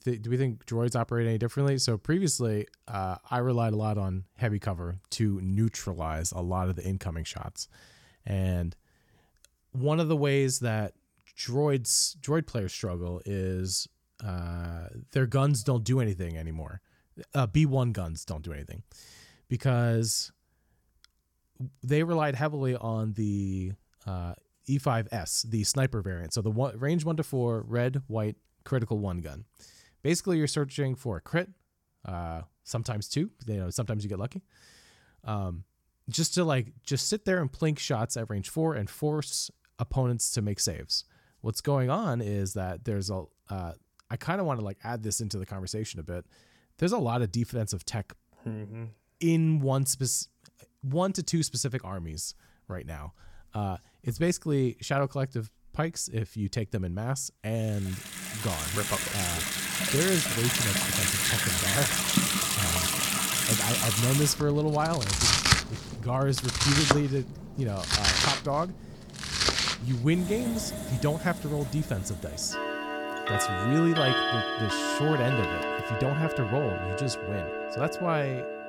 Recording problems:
household noises; very loud; from 58 s on; 3 dB above the speech

